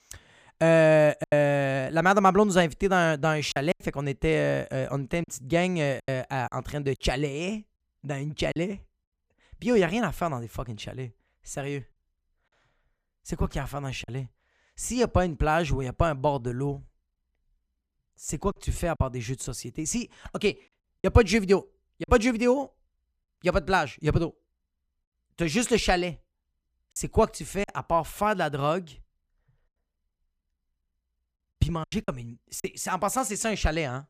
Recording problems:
choppy; occasionally; 4% of the speech affected

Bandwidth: 15 kHz